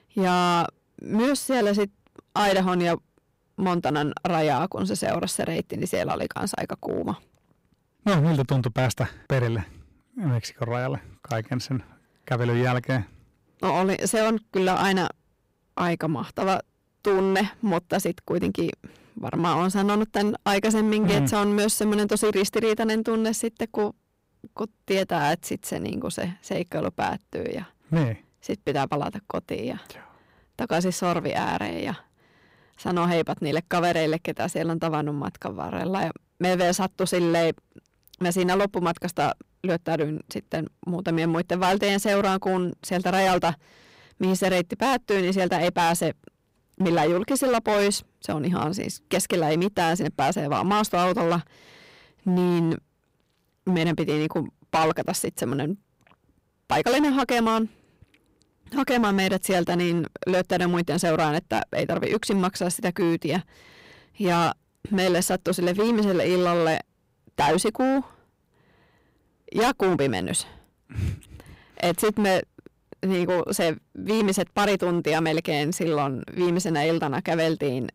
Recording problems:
distortion; heavy; 11% of the sound clipped

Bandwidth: 15.5 kHz